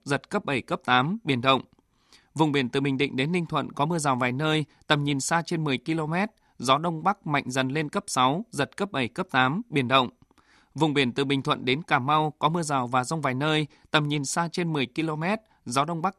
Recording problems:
none

